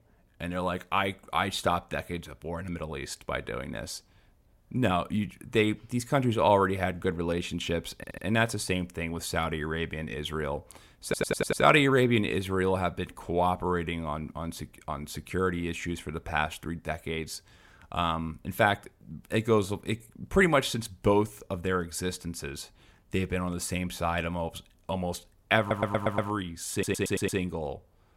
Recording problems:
audio stuttering; 4 times, first at 8 s

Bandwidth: 16 kHz